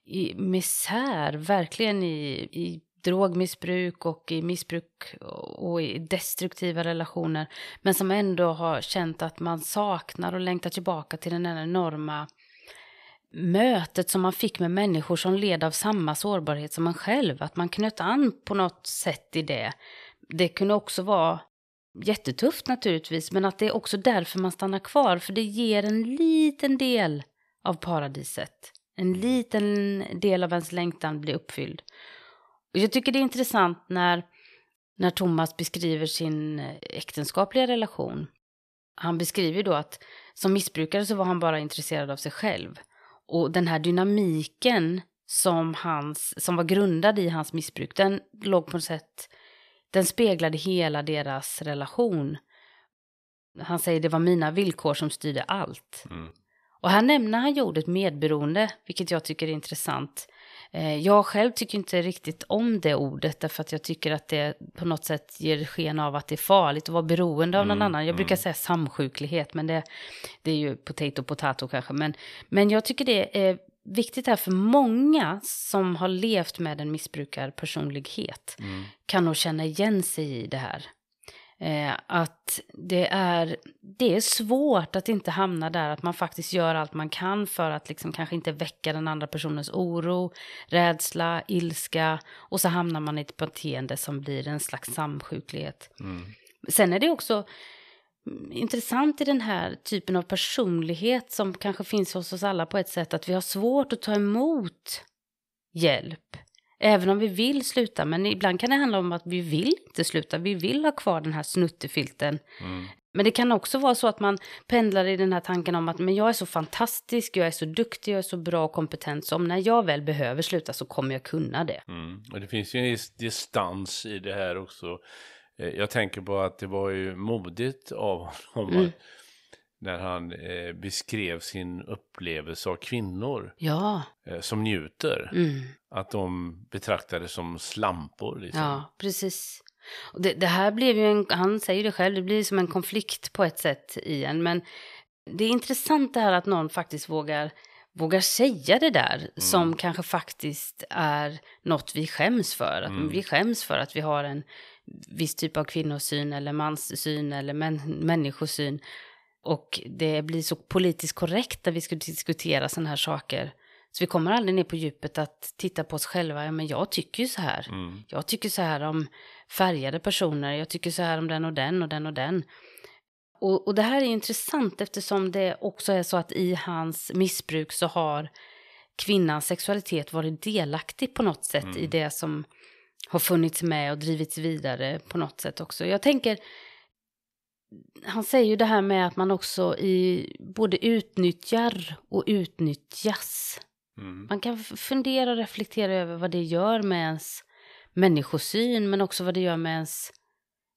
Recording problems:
none

